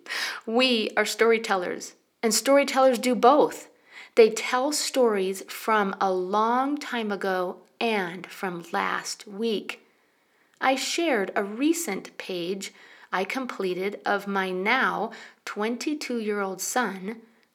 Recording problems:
thin; very slightly; fading below 350 Hz

